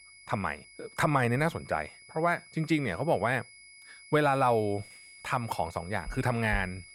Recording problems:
high-pitched whine; faint; throughout; 2 kHz, 20 dB below the speech

